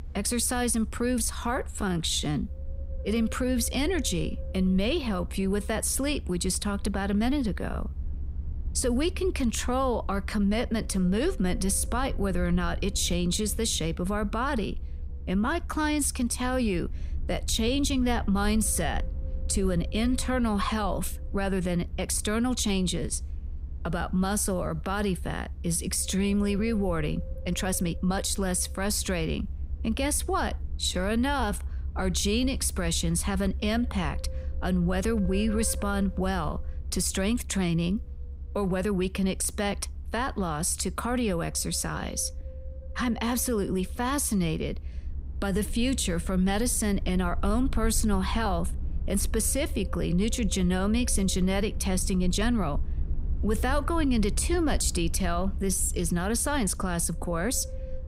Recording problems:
wind noise on the microphone; occasional gusts; 20 dB below the speech
low rumble; faint; throughout; 25 dB below the speech
uneven, jittery; strongly; from 1 to 56 s

